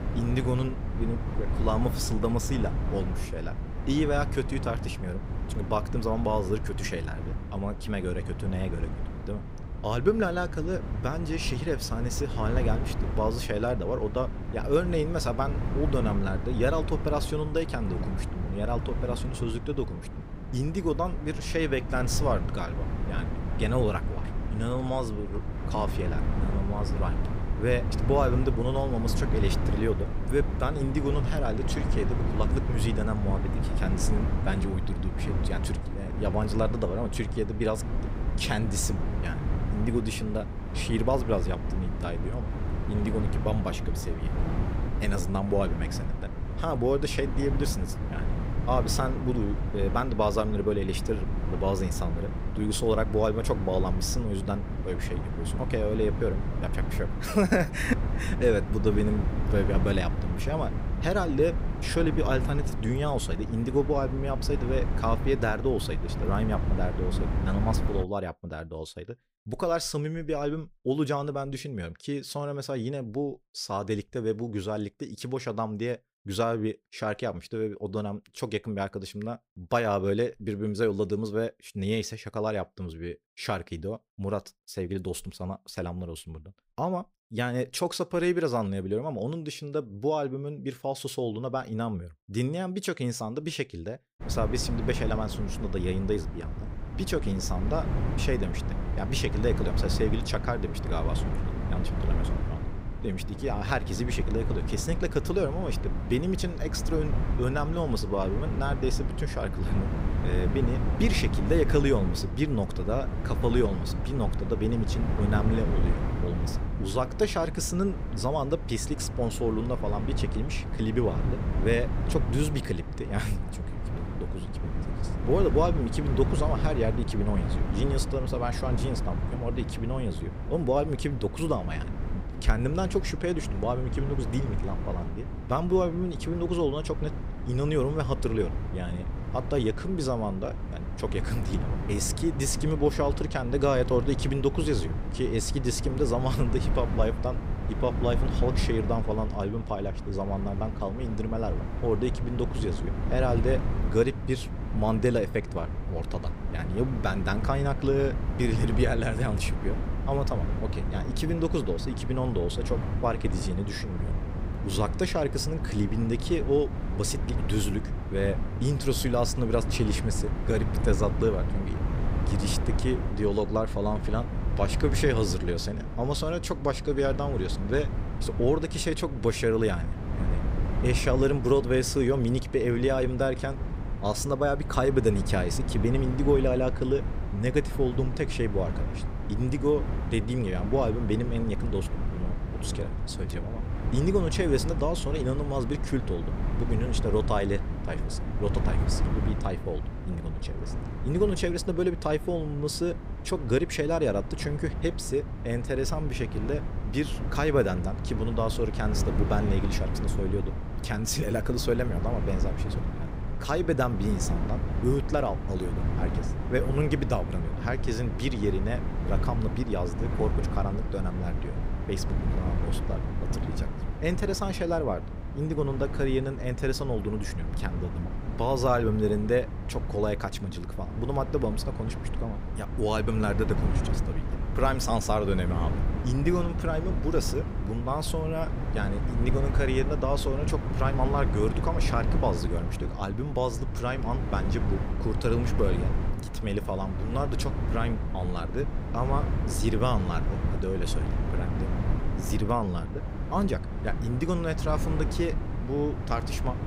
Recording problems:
wind noise on the microphone; heavy; until 1:08 and from 1:34 on; 9 dB below the speech

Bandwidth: 15.5 kHz